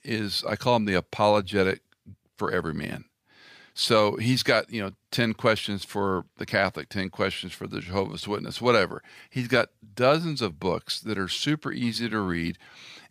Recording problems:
none

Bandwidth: 15 kHz